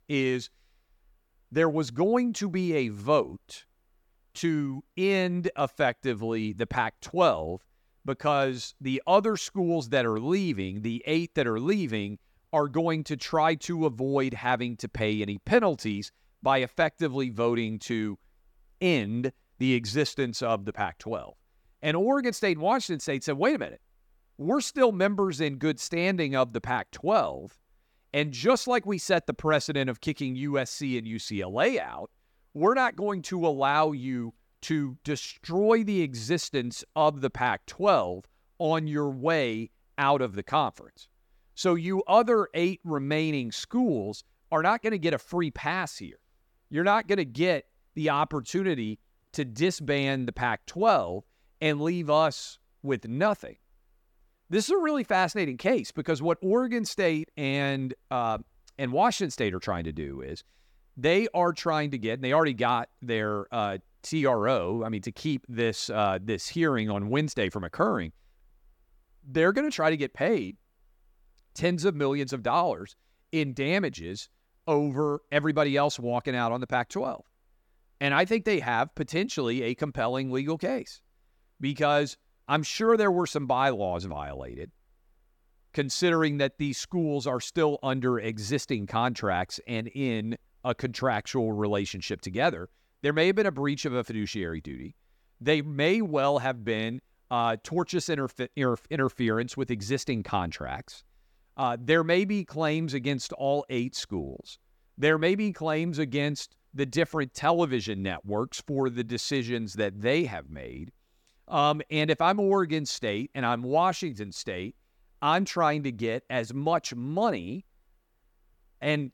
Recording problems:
none

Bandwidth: 17.5 kHz